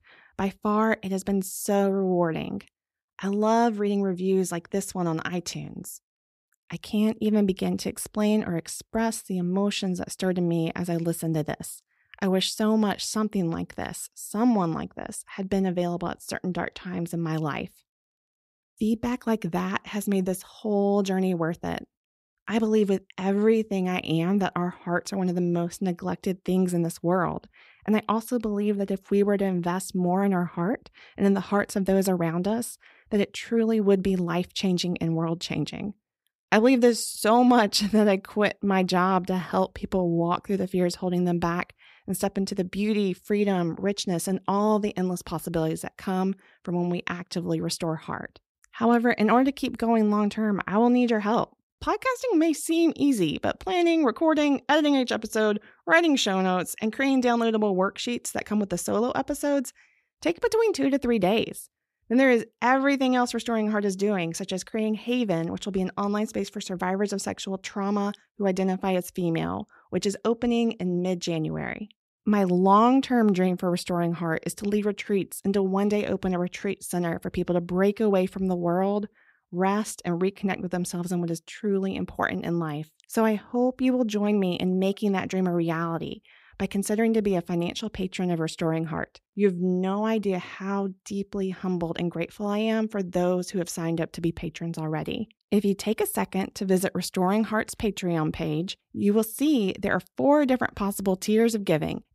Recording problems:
none

